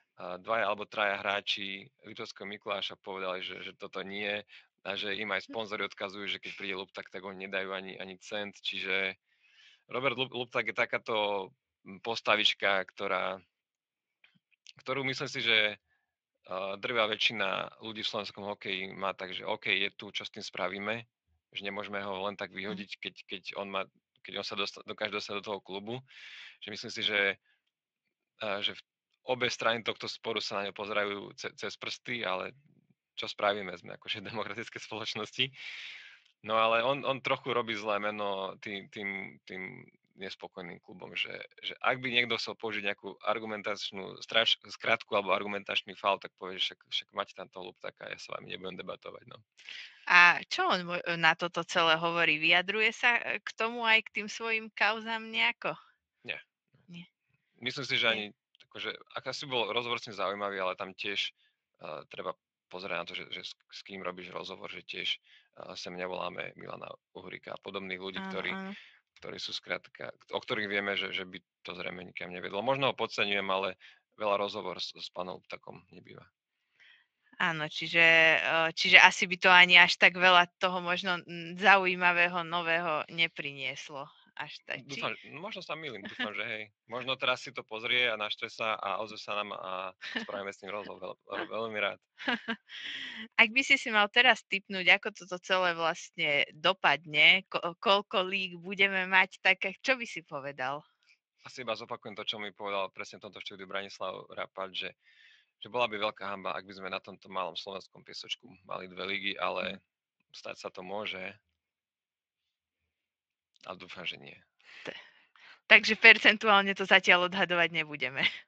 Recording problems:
thin; somewhat; fading below 1 kHz
garbled, watery; slightly

